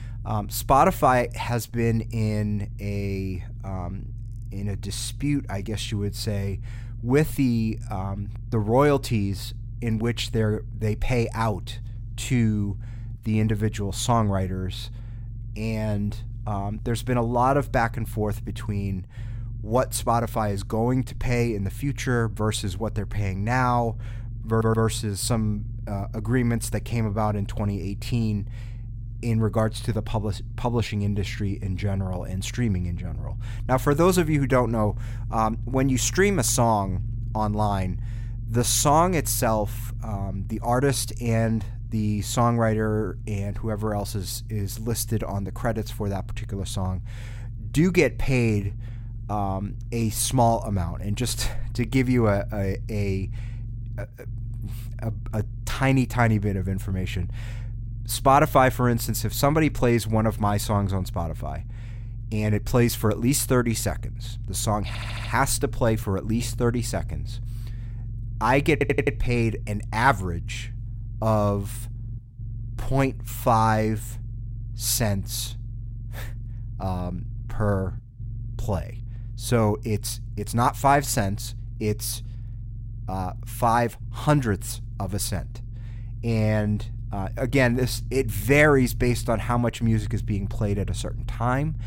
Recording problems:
low rumble; faint; throughout; 25 dB below the speech
audio stuttering; at 24 s, at 1:05 and at 1:09

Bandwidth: 16 kHz